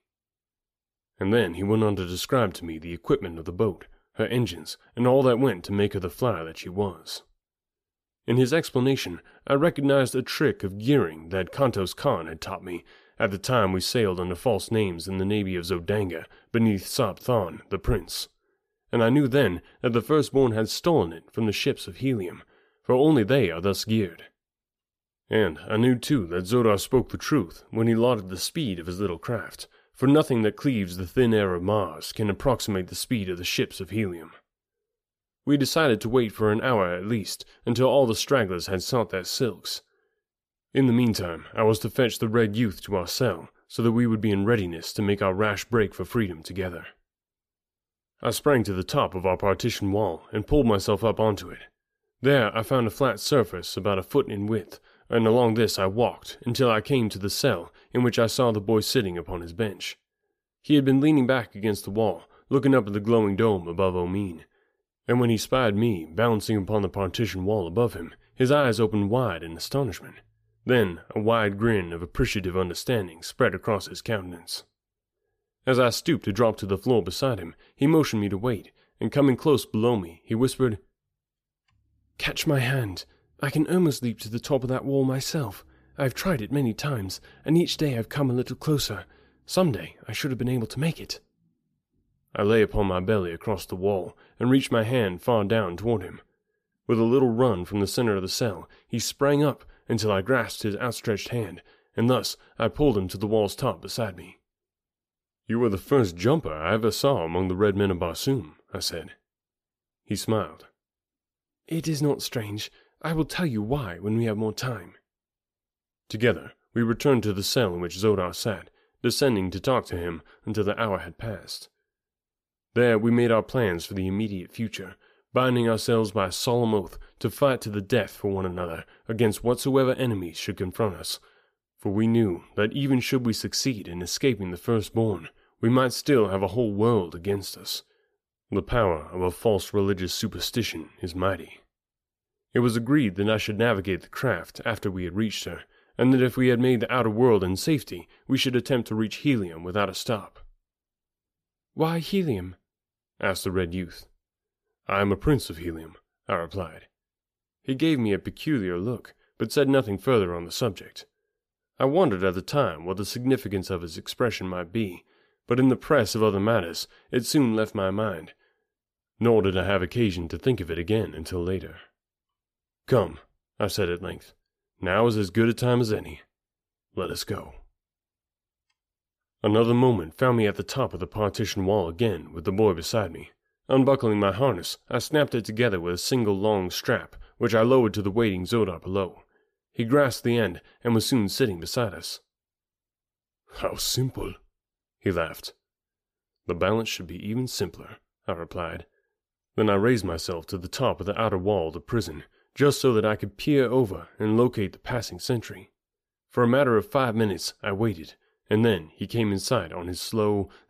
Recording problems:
none

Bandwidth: 14.5 kHz